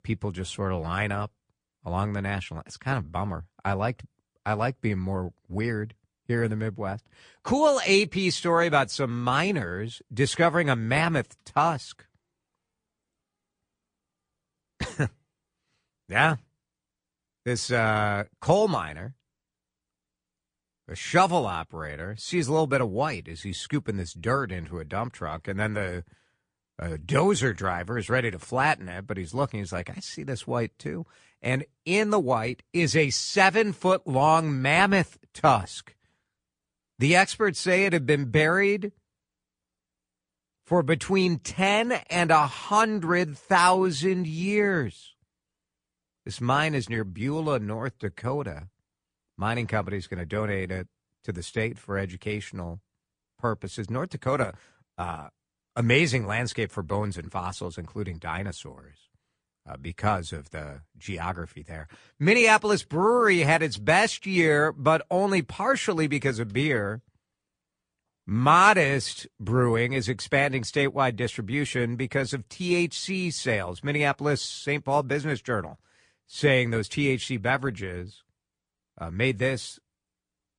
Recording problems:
garbled, watery; slightly; nothing above 9 kHz

